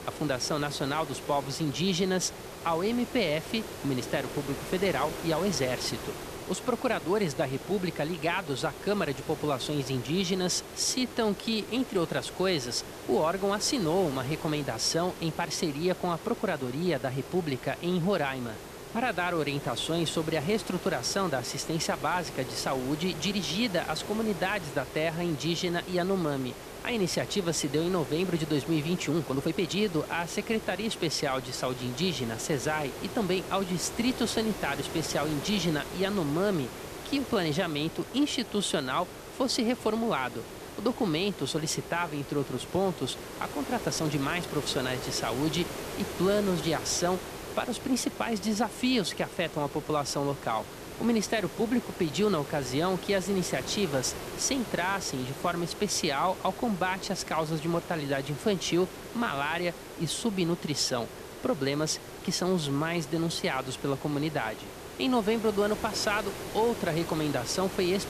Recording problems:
hiss; noticeable; throughout; 10 dB below the speech
uneven, jittery; strongly; from 11 to 45 s

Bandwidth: 14.5 kHz